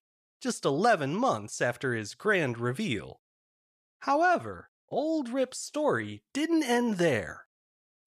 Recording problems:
none

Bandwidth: 14.5 kHz